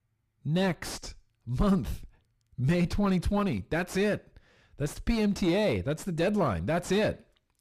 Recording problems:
distortion; slight; 7 dB below the speech

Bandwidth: 15 kHz